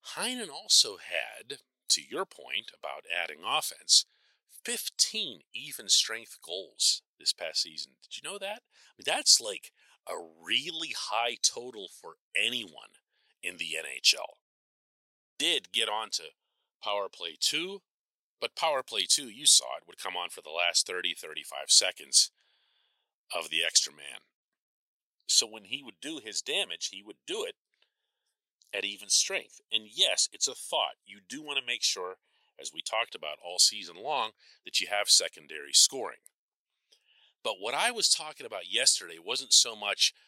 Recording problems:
thin; very; fading below 800 Hz

